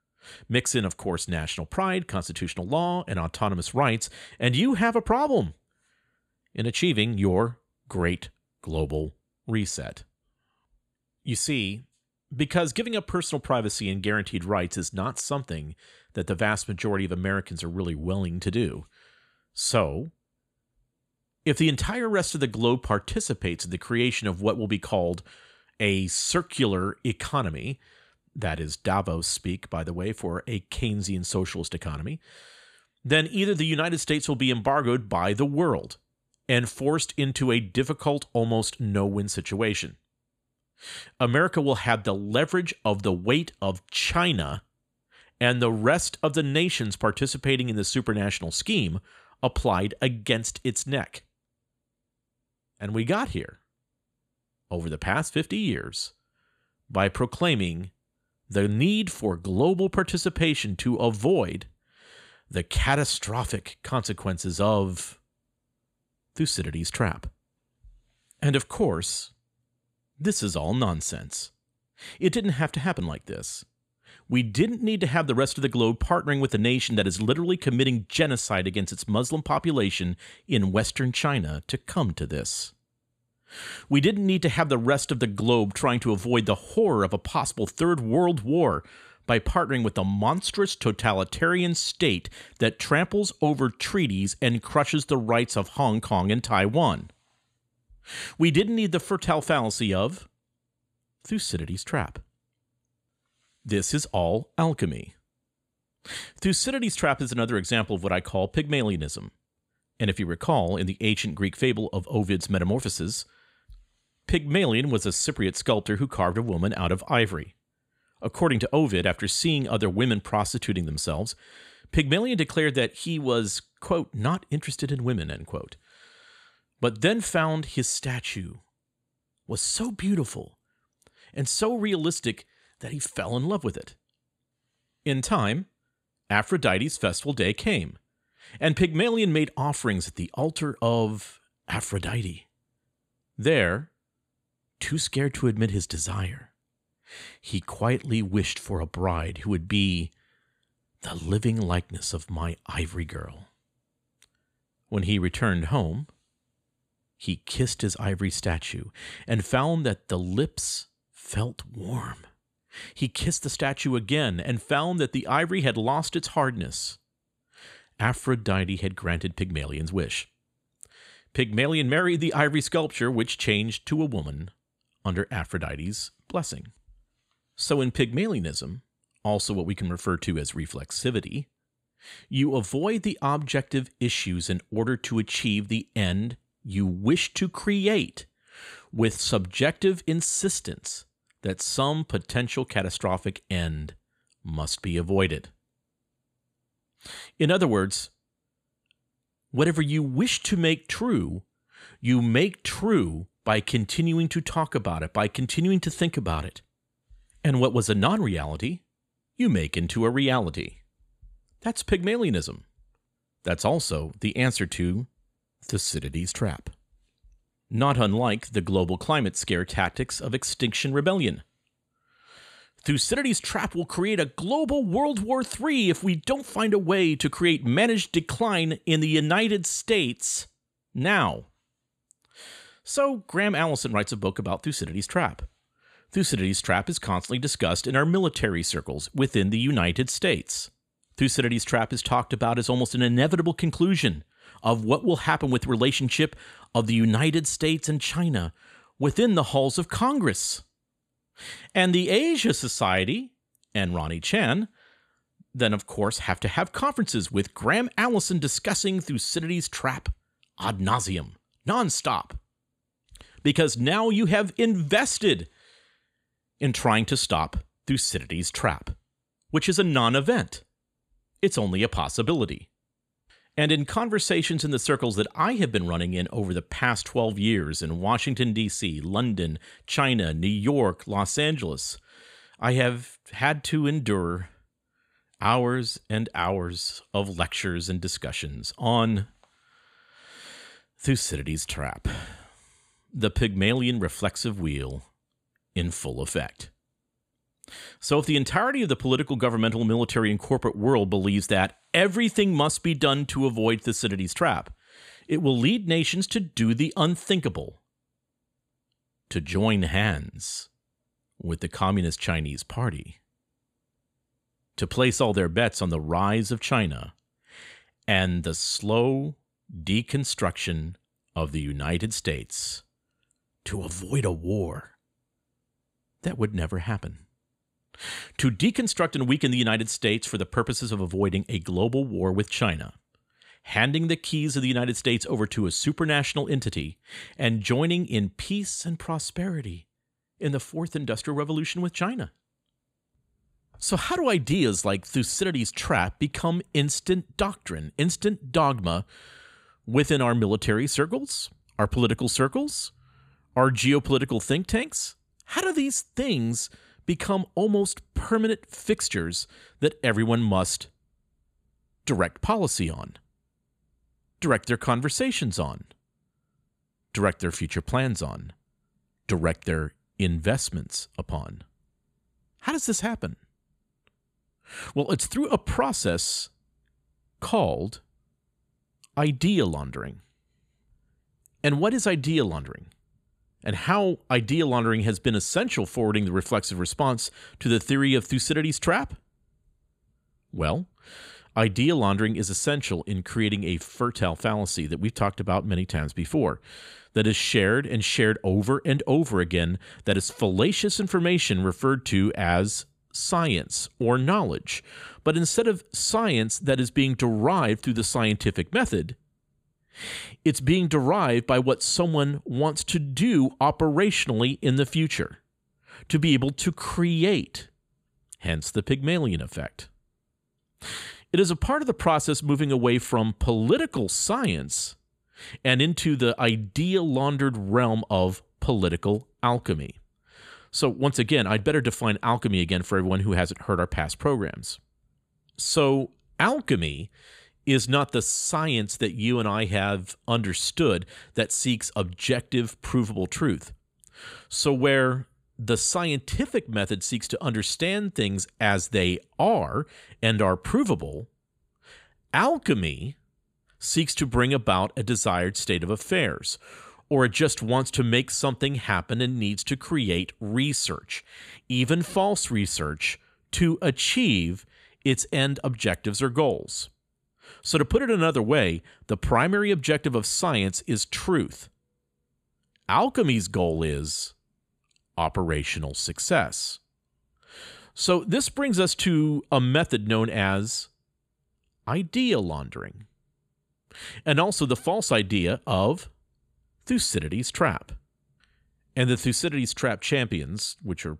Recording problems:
none

